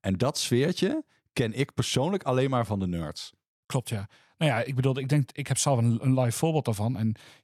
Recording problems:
none

